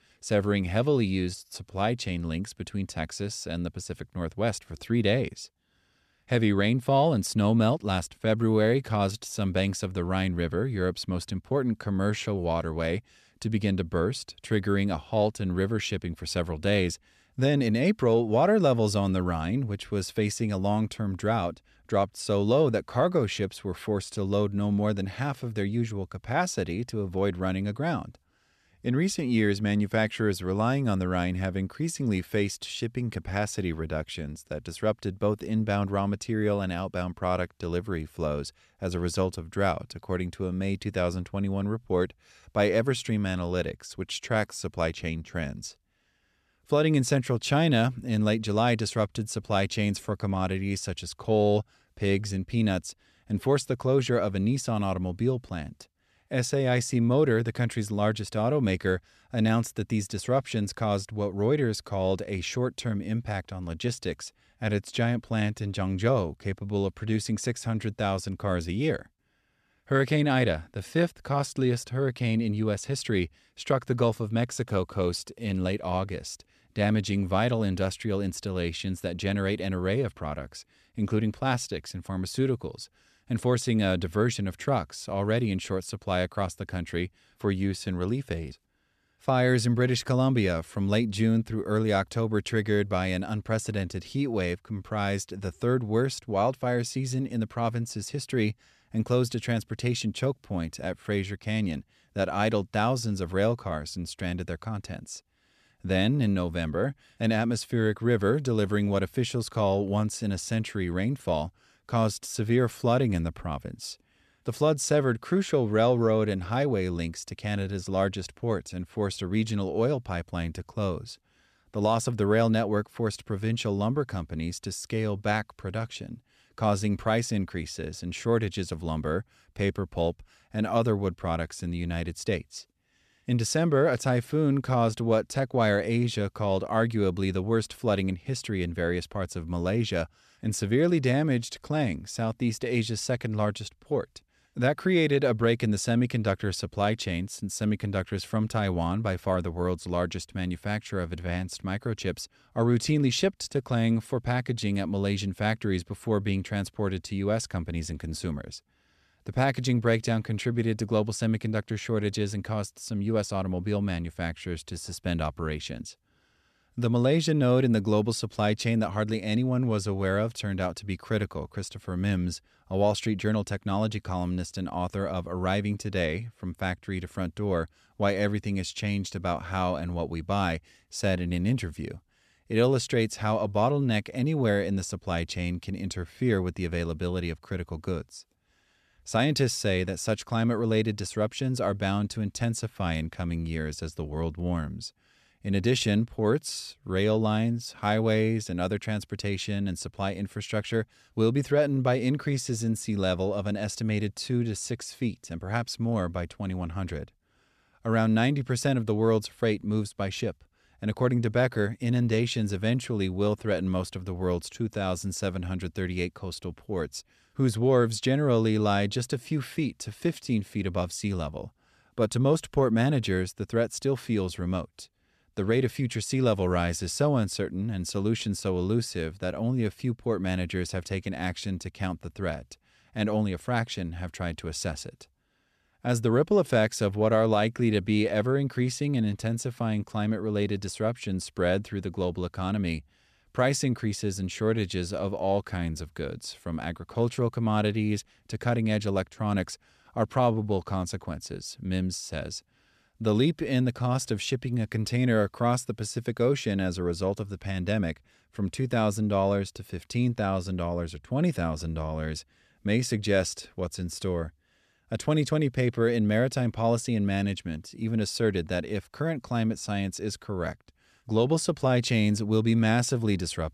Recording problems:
none

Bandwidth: 14 kHz